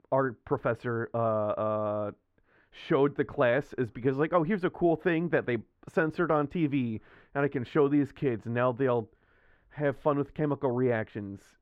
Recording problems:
muffled; very; fading above 4 kHz

